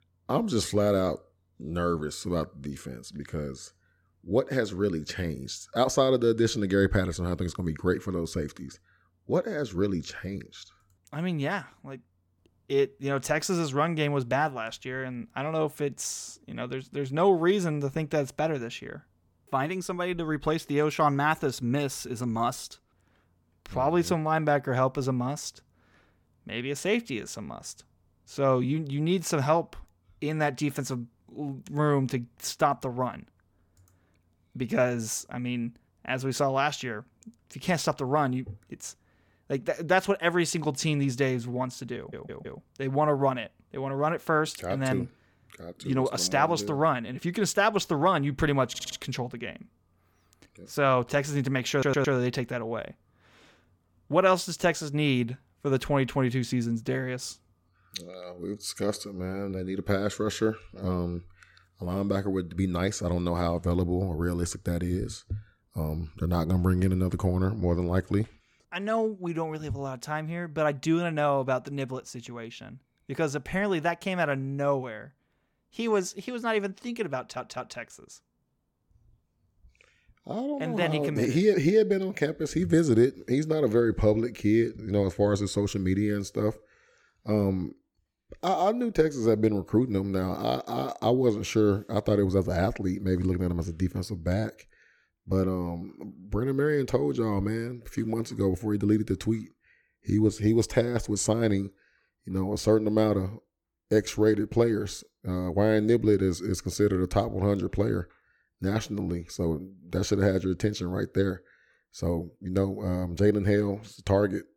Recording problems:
audio stuttering; 4 times, first at 42 s

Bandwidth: 18 kHz